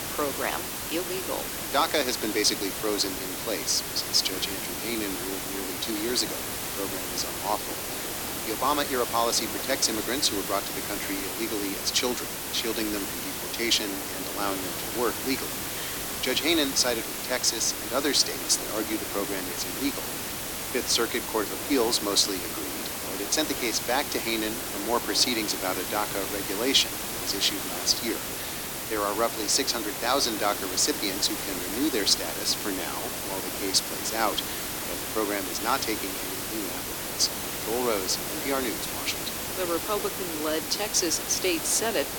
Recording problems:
thin; somewhat; fading below 300 Hz
hiss; loud; throughout; 3 dB below the speech
wind noise on the microphone; occasional gusts; 20 dB below the speech

